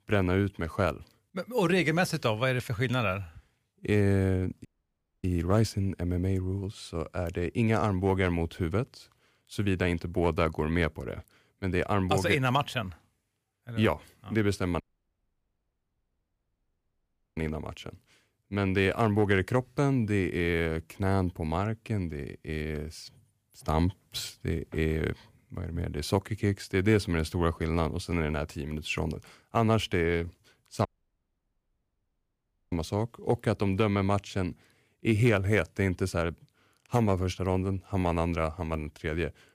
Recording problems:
audio cutting out; at 4.5 s for 0.5 s, at 15 s for 2.5 s and at 31 s for 2 s

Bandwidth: 15 kHz